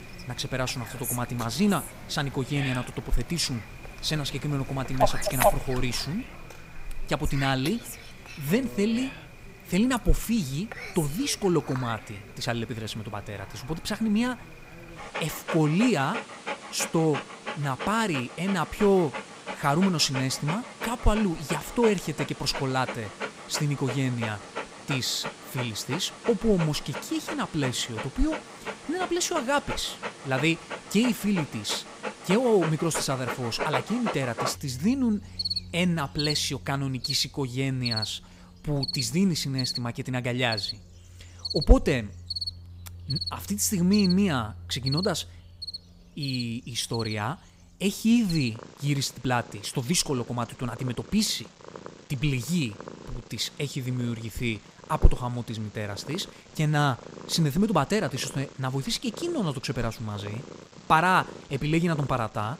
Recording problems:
animal sounds; loud; throughout; 8 dB below the speech

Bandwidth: 15.5 kHz